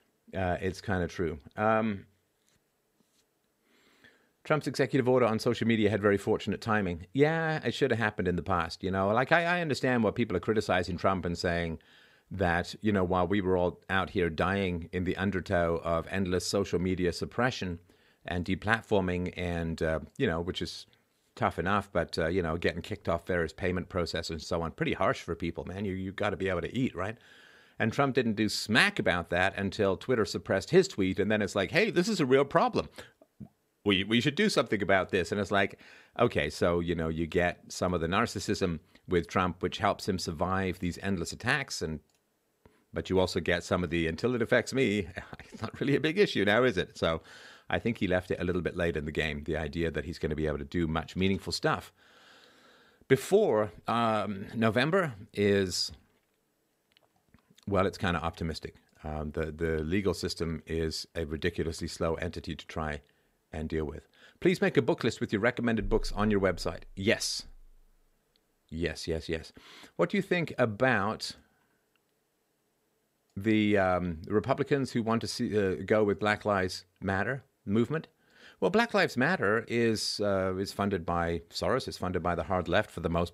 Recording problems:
none

